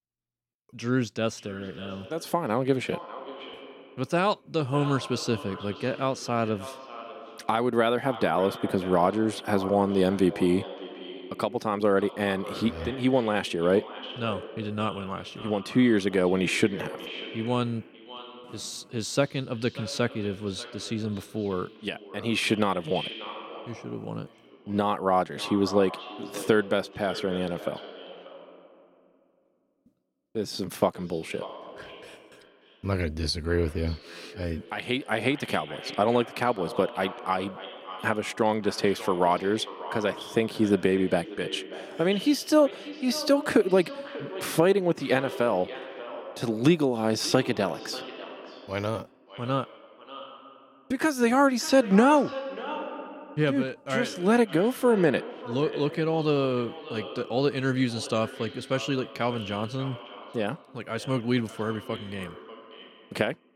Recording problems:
echo of what is said; noticeable; throughout; 590 ms later, 15 dB below the speech

